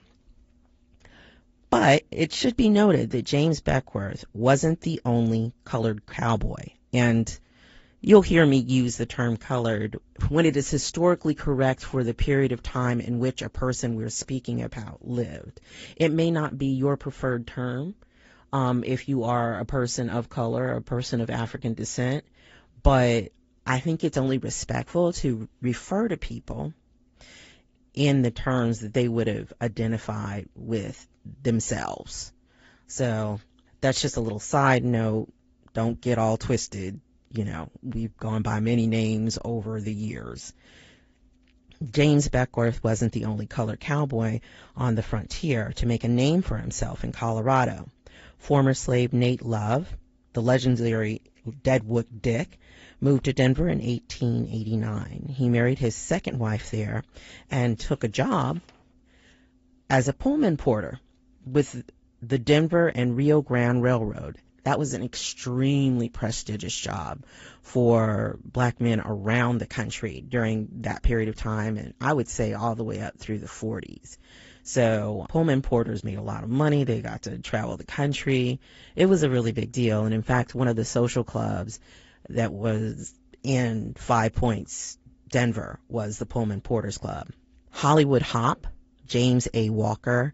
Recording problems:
garbled, watery; slightly; nothing above 7.5 kHz
high frequencies cut off; slight

